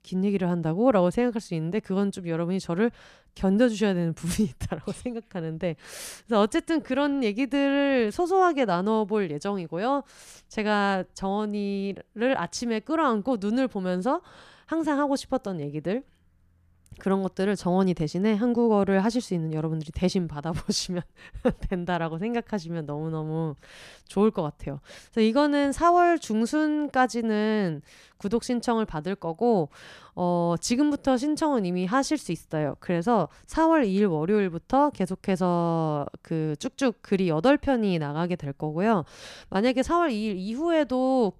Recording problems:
none

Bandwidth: 14.5 kHz